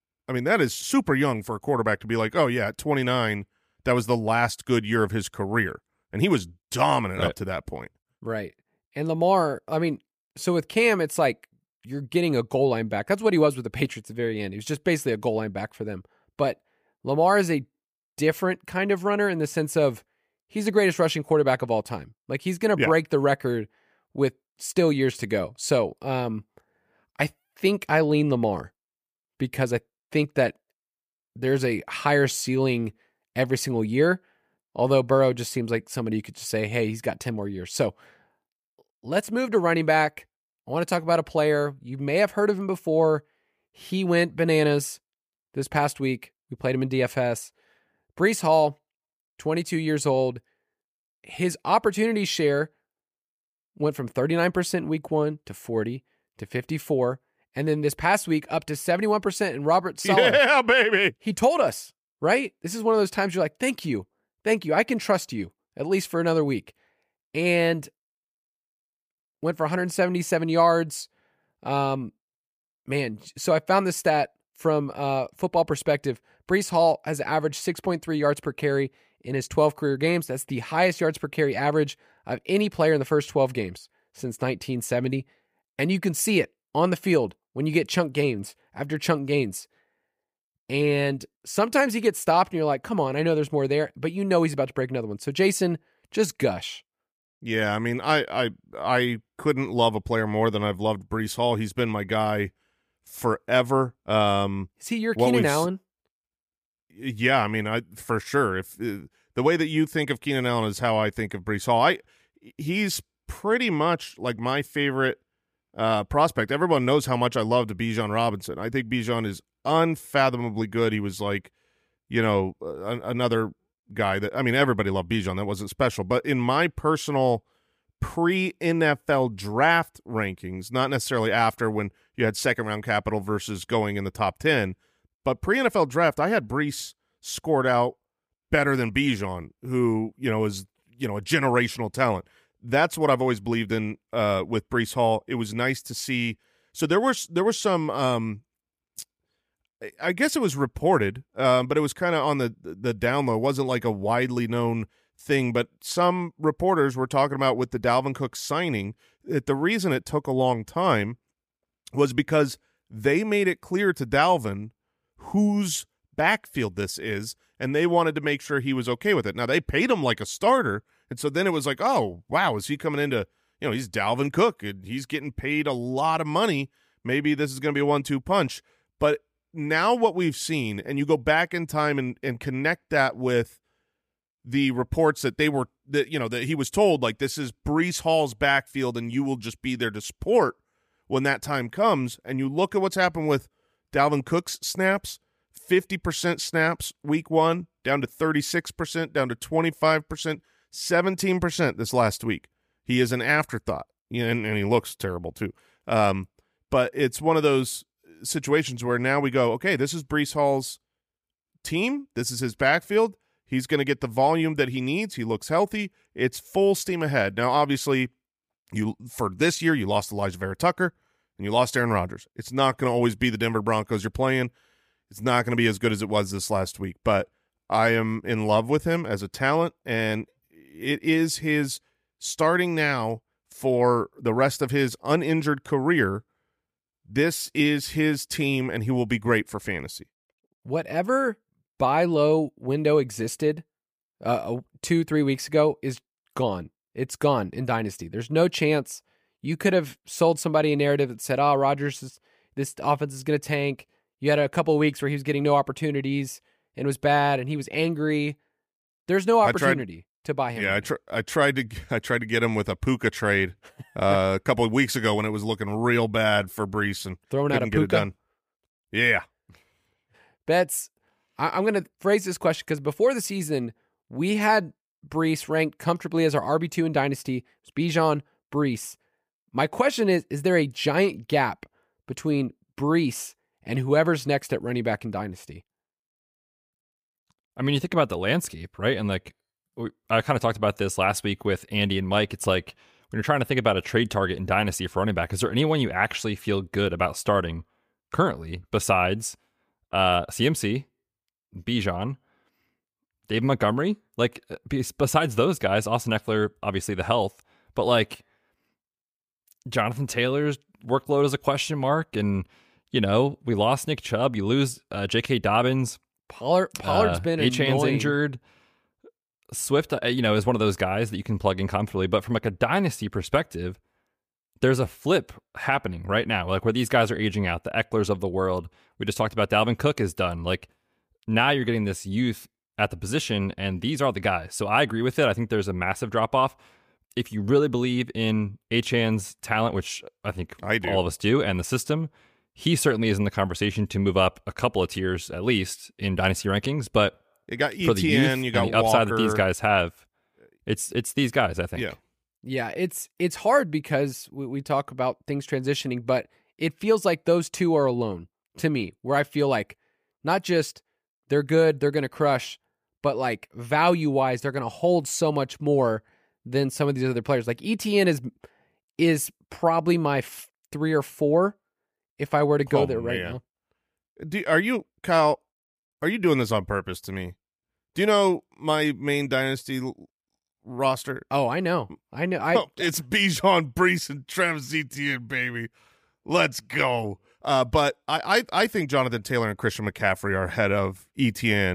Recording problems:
abrupt cut into speech; at the end

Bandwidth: 15 kHz